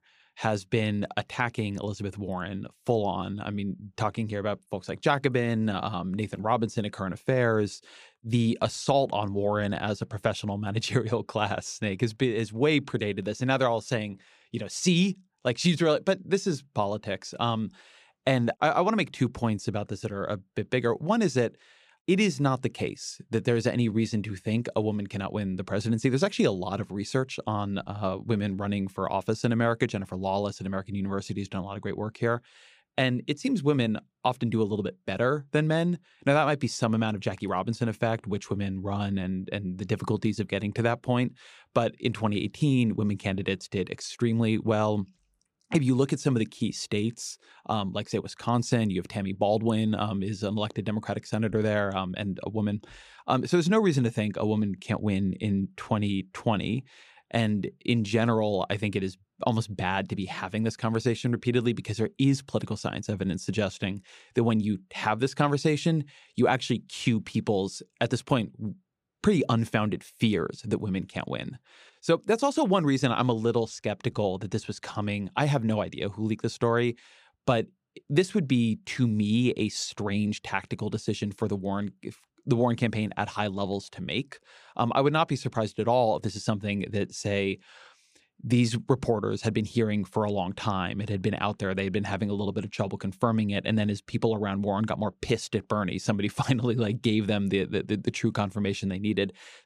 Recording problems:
none

